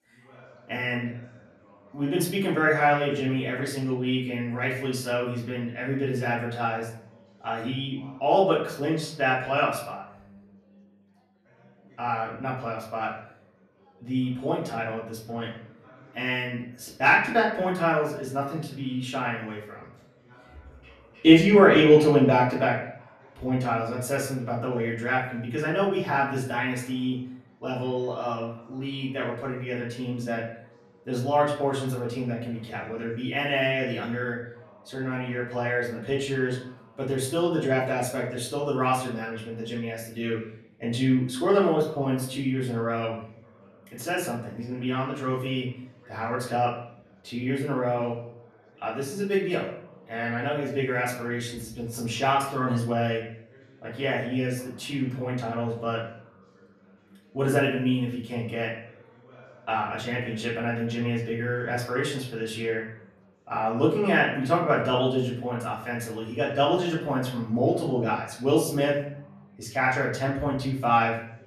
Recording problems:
off-mic speech; far
room echo; slight; dies away in 0.6 s
background chatter; faint; throughout; 4 voices, 30 dB below the speech

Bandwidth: 13.5 kHz